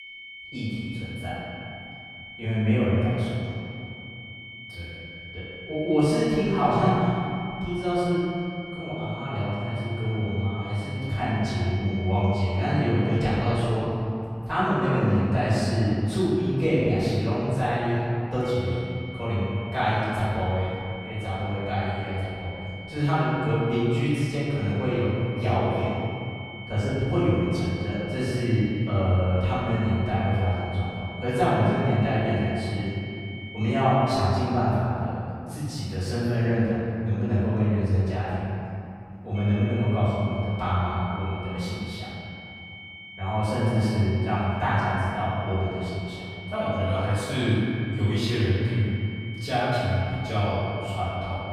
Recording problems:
room echo; strong; dies away in 2.7 s
off-mic speech; far
high-pitched whine; noticeable; until 14 s, from 18 to 34 s and from 39 s on; 2 kHz, 15 dB below the speech

